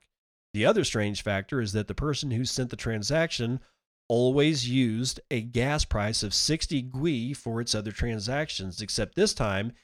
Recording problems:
none

